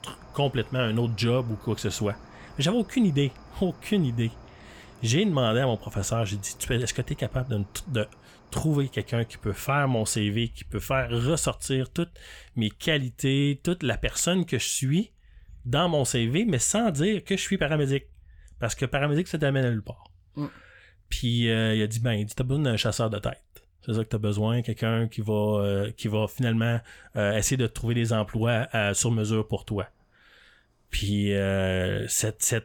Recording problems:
animal sounds; faint; throughout; 25 dB below the speech

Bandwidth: 18.5 kHz